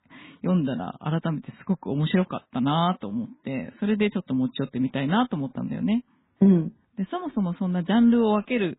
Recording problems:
garbled, watery; badly
high frequencies cut off; severe; nothing above 4 kHz

